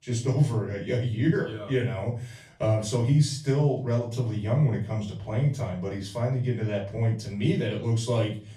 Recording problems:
off-mic speech; far
room echo; slight; dies away in 0.3 s

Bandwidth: 14.5 kHz